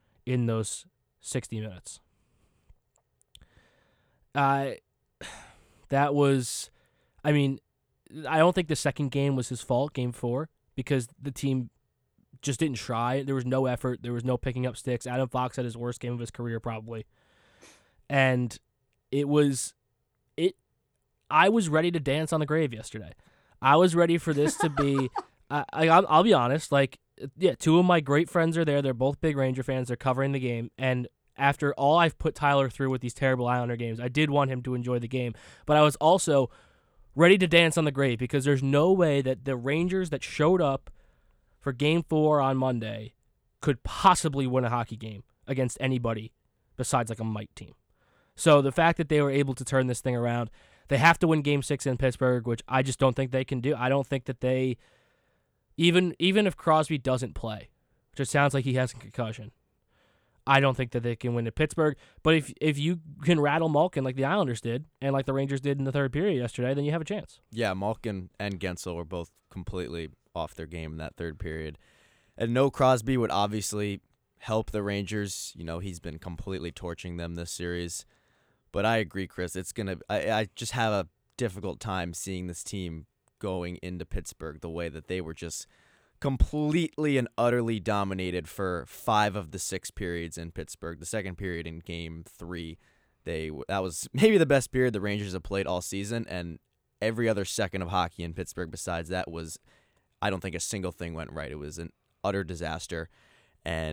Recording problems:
abrupt cut into speech; at the end

